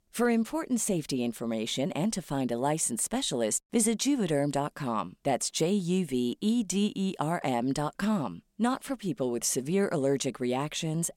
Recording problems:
none

